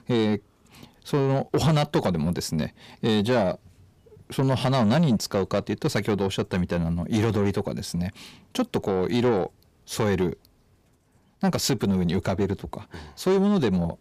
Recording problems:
distortion; slight; 10 dB below the speech

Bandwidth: 15 kHz